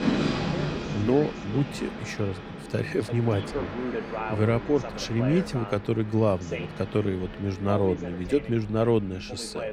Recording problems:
train or aircraft noise; loud; throughout; 8 dB below the speech
voice in the background; loud; throughout; 10 dB below the speech

